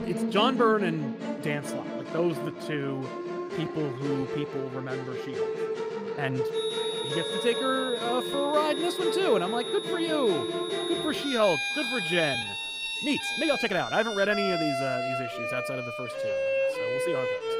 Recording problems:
high-pitched whine; loud; from 6.5 to 14 s; 4 kHz, 5 dB below the speech
background music; loud; throughout; 2 dB below the speech
voice in the background; faint; throughout; 20 dB below the speech
uneven, jittery; strongly; from 2 to 14 s

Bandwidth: 15.5 kHz